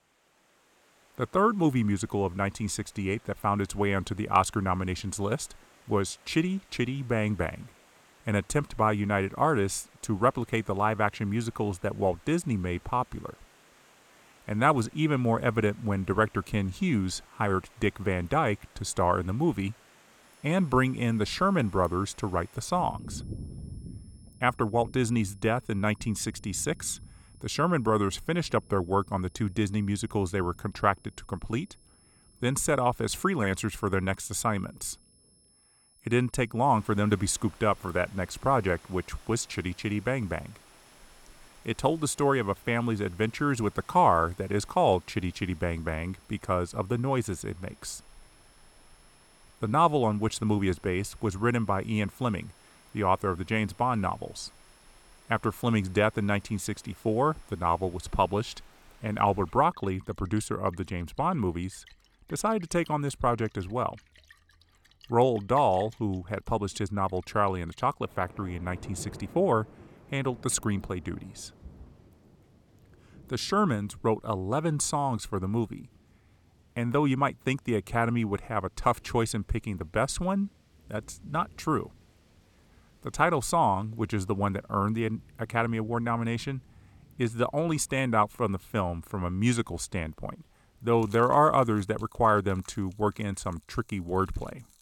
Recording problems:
high-pitched whine; faint; from 20 to 59 s; 10.5 kHz, 35 dB below the speech
rain or running water; faint; throughout; 25 dB below the speech

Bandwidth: 17.5 kHz